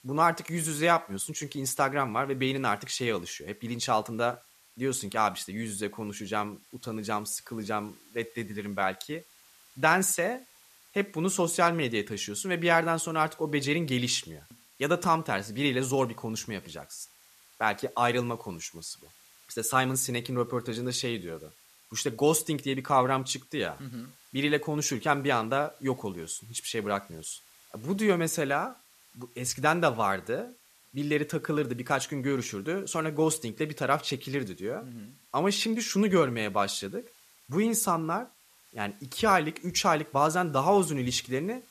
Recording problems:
hiss; faint; throughout; 25 dB below the speech

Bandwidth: 14.5 kHz